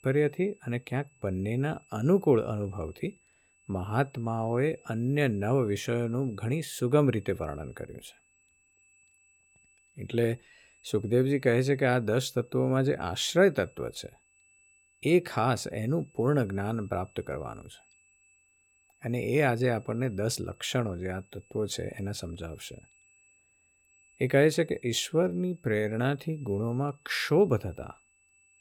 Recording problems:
high-pitched whine; faint; throughout; 2.5 kHz, 35 dB below the speech

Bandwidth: 17.5 kHz